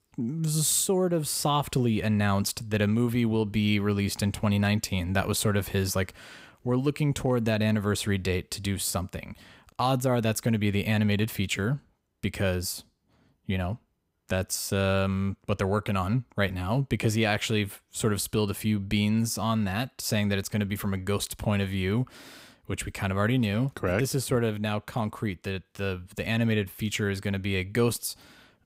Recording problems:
none

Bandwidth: 15.5 kHz